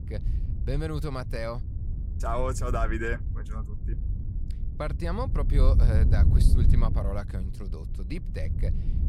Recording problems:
wind noise on the microphone; heavy; 10 dB below the speech

